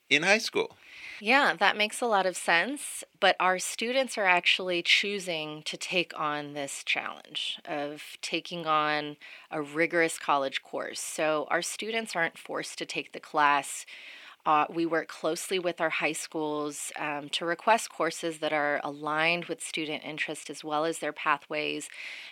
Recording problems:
thin; very slightly; fading below 300 Hz

